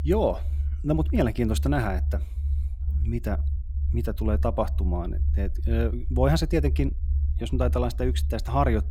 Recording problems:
low rumble; noticeable; throughout; 15 dB below the speech

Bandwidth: 16.5 kHz